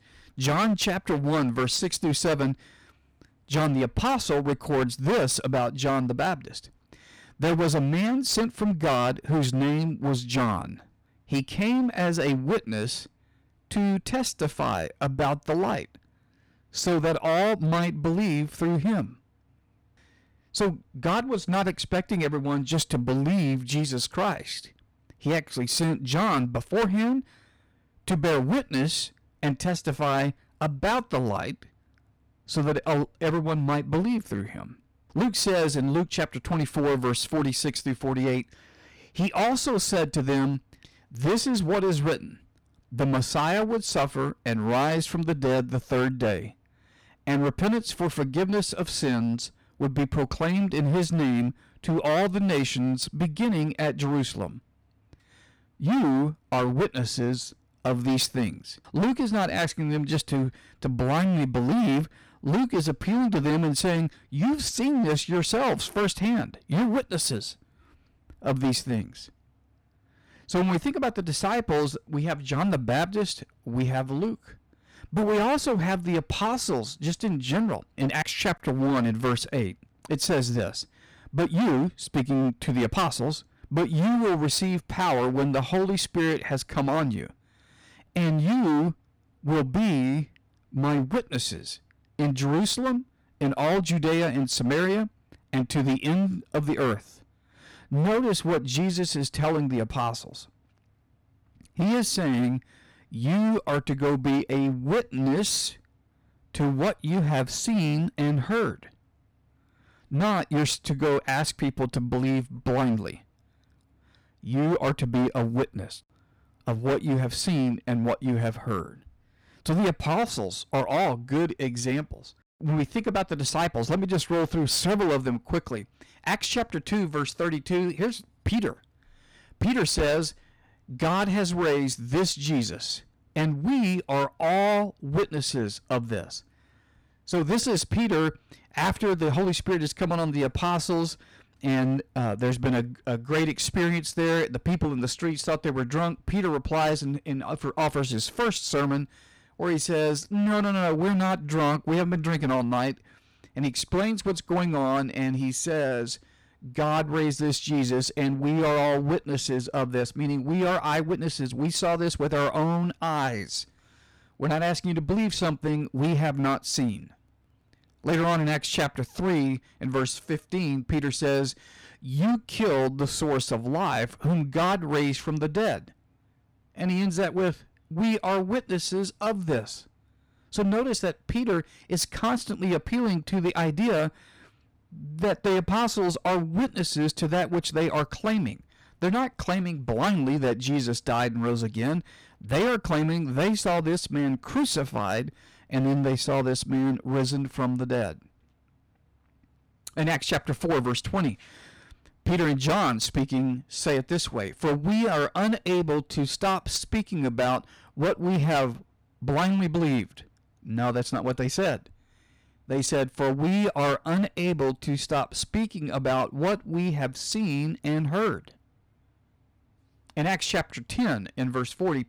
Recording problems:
distortion; heavy; 15% of the sound clipped

